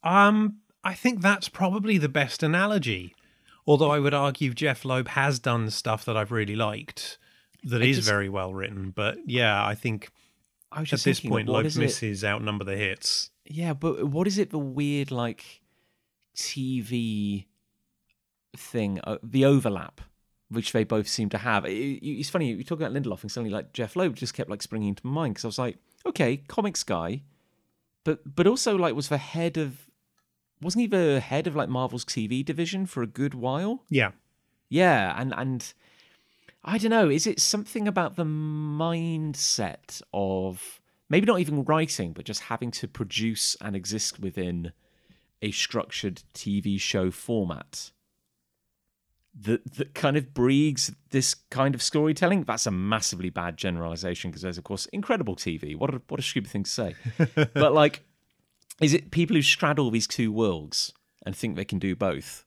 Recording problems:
none

